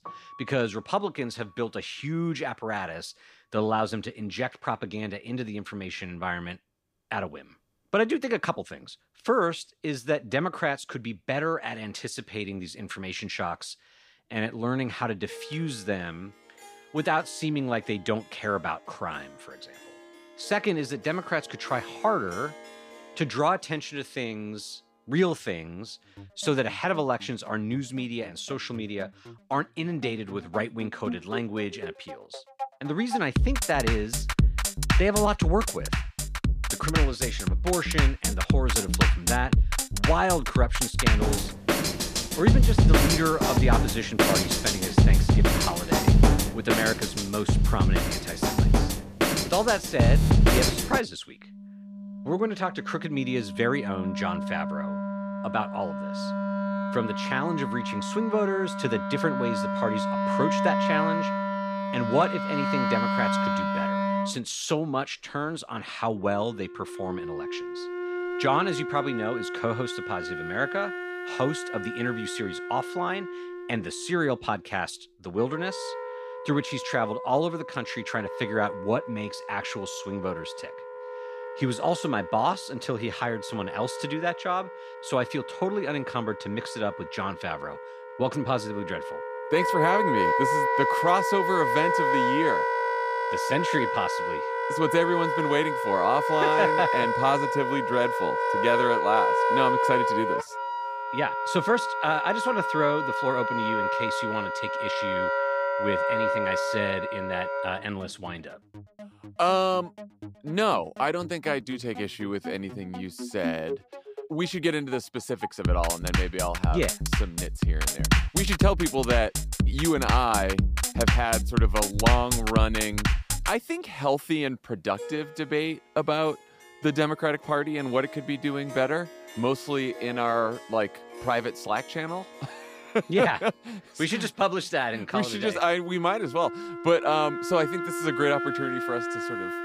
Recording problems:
background music; very loud; throughout; 2 dB above the speech

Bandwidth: 15 kHz